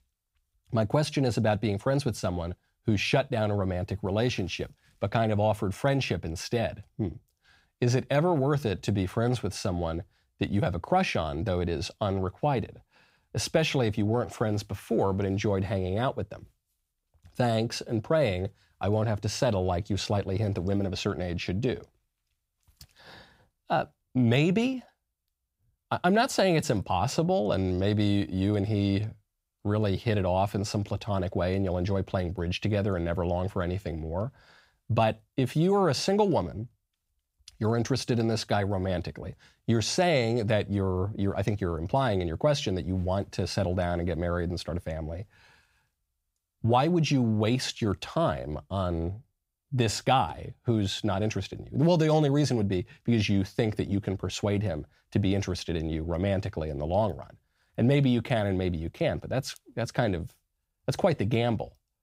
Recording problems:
none

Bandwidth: 15.5 kHz